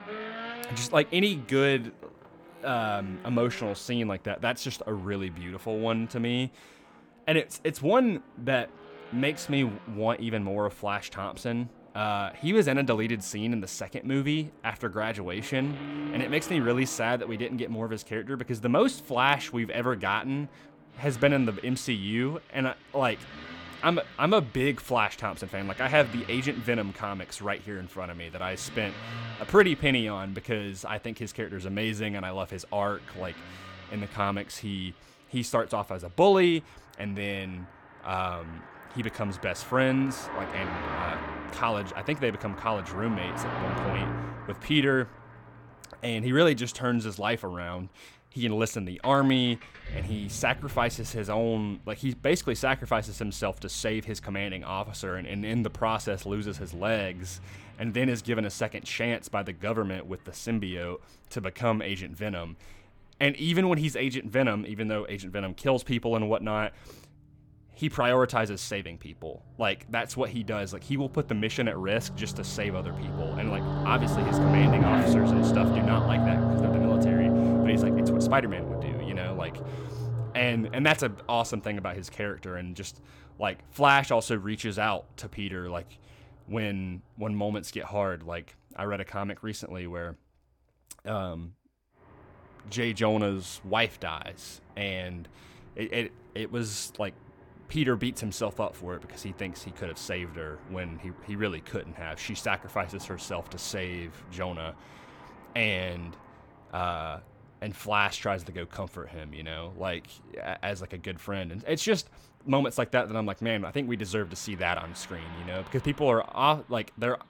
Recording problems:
traffic noise; loud; throughout; 1 dB below the speech

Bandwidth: 18 kHz